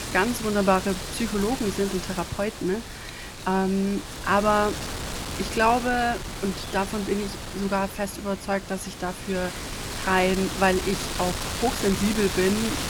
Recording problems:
wind noise on the microphone; heavy; 7 dB below the speech

